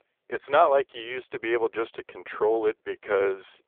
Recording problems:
phone-call audio; poor line; nothing above 3.5 kHz

